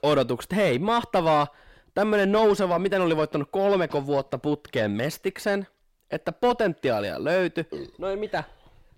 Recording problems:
distortion; slight; 10 dB below the speech

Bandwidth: 16 kHz